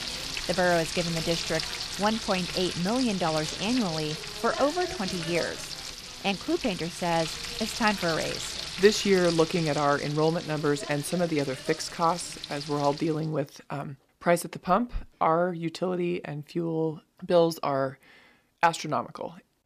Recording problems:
household noises; loud; until 13 s; 6 dB below the speech

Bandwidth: 14.5 kHz